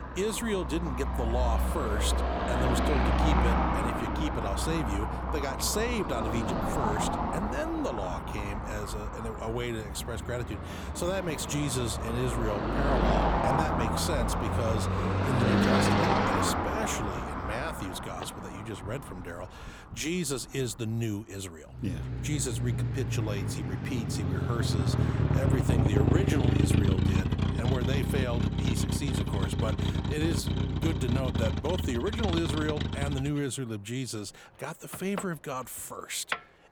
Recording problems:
traffic noise; very loud; throughout; 4 dB above the speech

